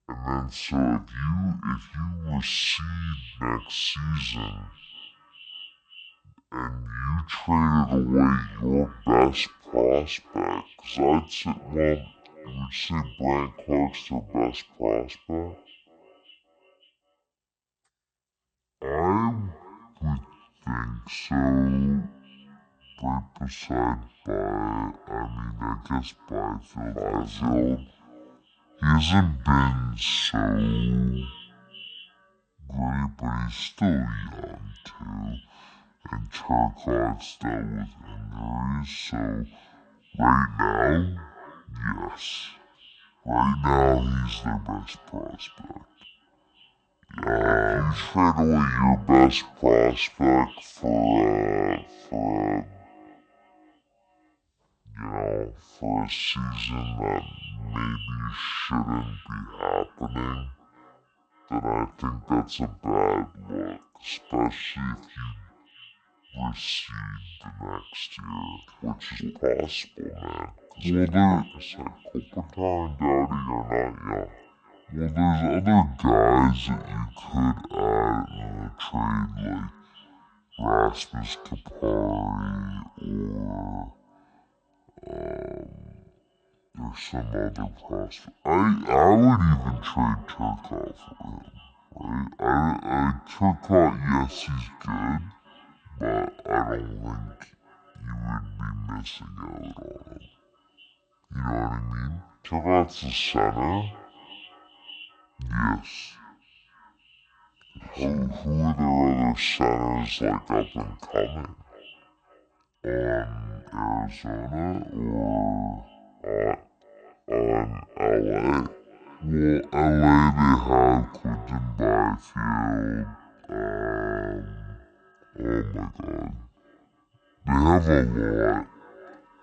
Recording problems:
wrong speed and pitch; too slow and too low; 0.5 times normal speed
echo of what is said; faint; throughout; 570 ms later, 25 dB below the speech

